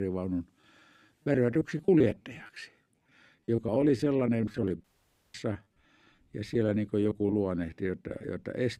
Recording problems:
choppy; very; 15% of the speech affected
abrupt cut into speech; at the start
audio cutting out; at 5 s for 0.5 s

